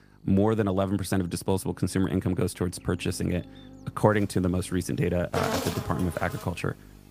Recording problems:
animal sounds; loud; from 4.5 s on; 7 dB below the speech
electrical hum; faint; throughout; 50 Hz, 25 dB below the speech

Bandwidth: 15 kHz